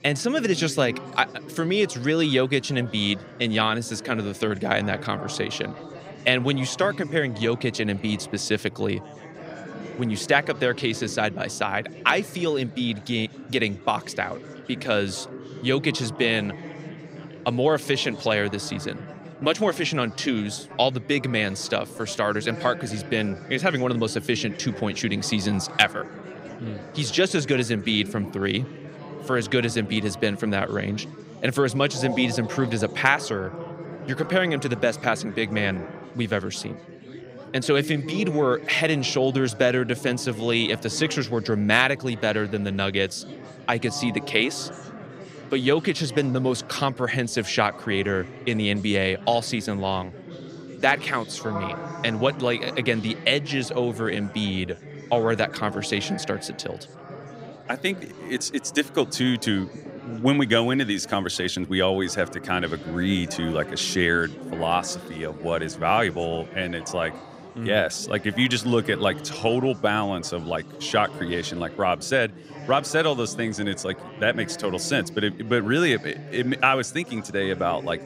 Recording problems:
chatter from many people; noticeable; throughout; 15 dB below the speech

